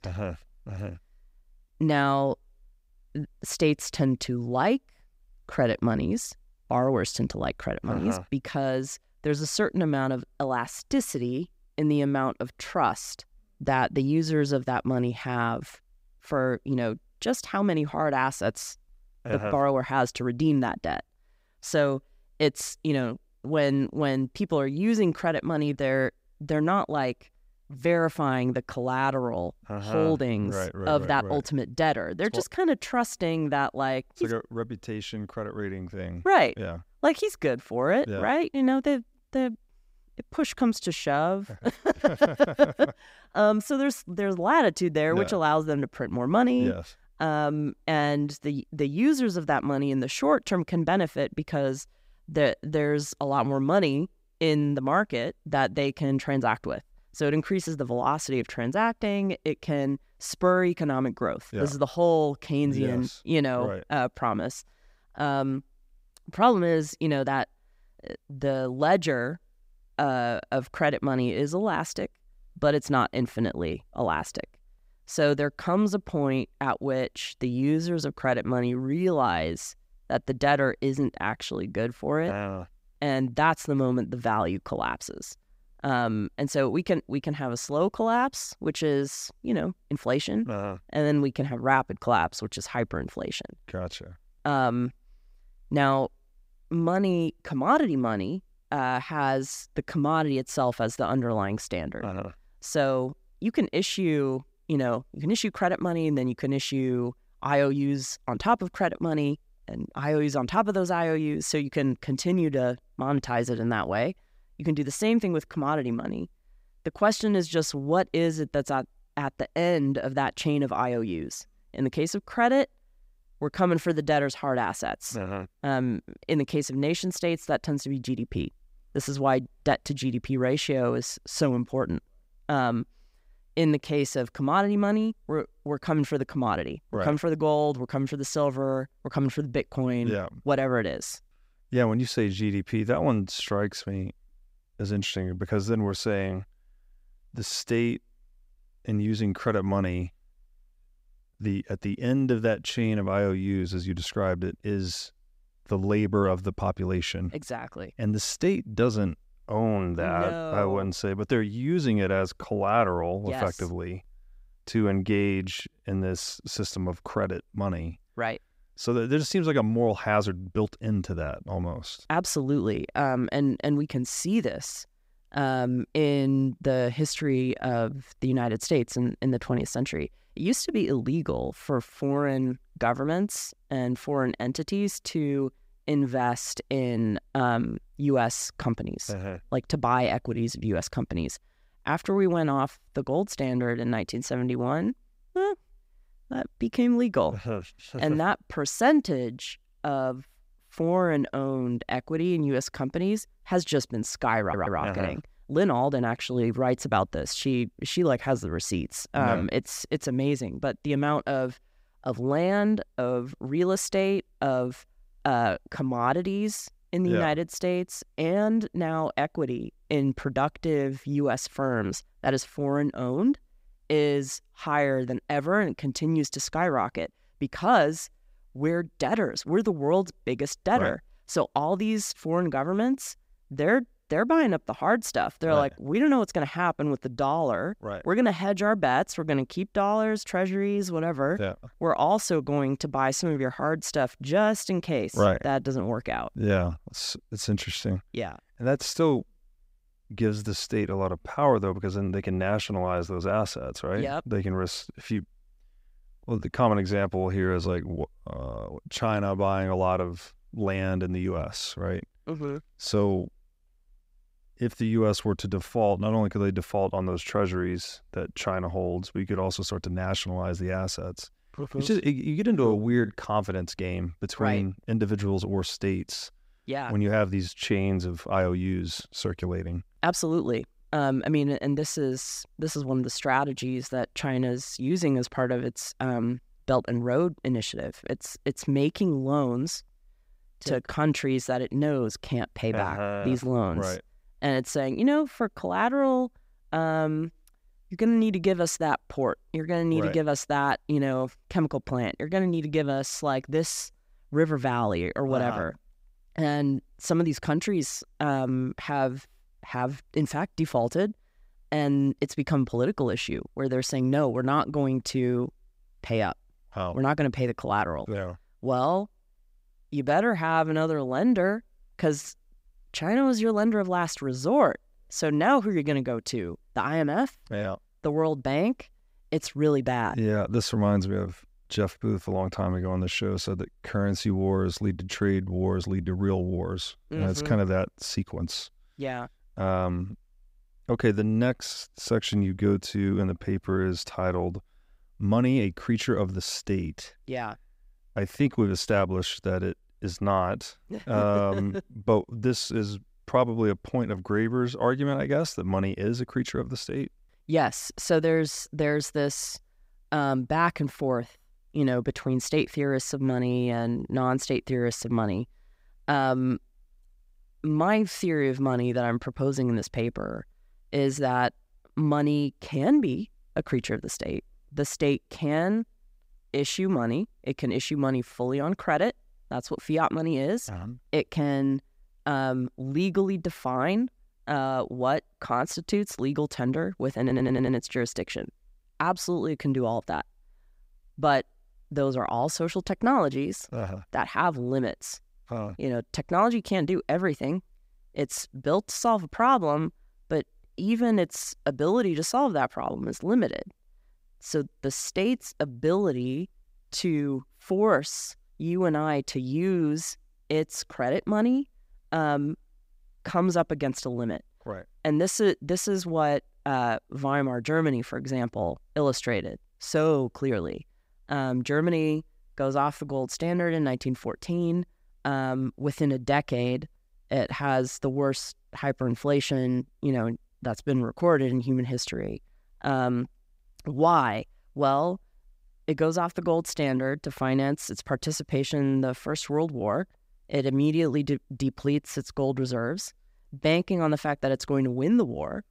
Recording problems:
audio stuttering; at 3:24 and at 6:27

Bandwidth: 15.5 kHz